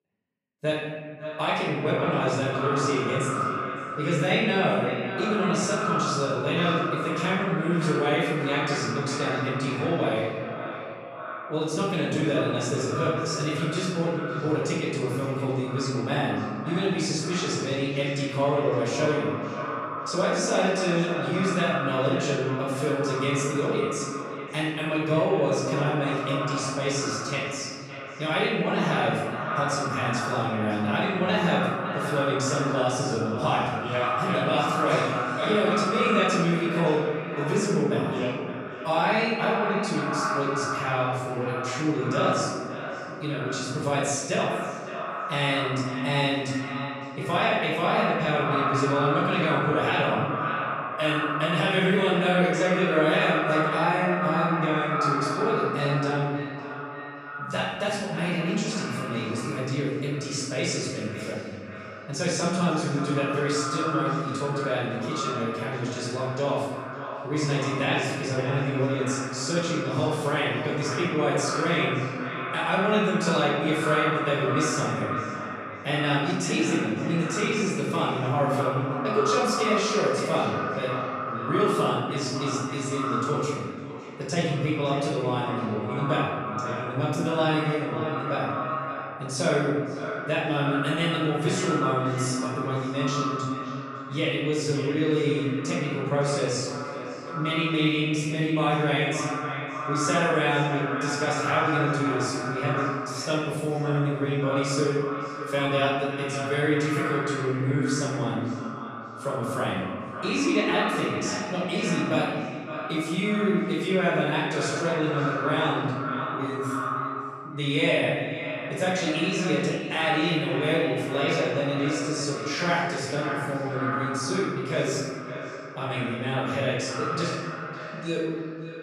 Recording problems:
echo of what is said; strong; throughout; 560 ms later, 6 dB below the speech
off-mic speech; far
room echo; noticeable; dies away in 1.6 s

